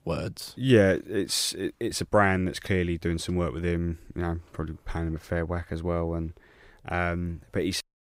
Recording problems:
none

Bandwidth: 15.5 kHz